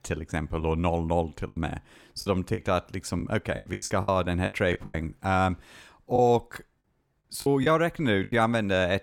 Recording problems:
choppy; very; 11% of the speech affected

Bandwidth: 17.5 kHz